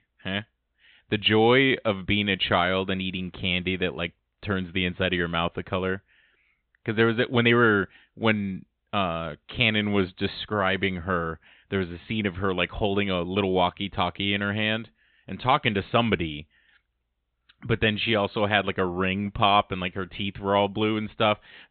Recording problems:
high frequencies cut off; severe; nothing above 4 kHz

